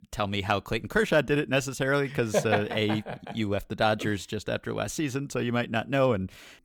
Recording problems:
none

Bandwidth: 19 kHz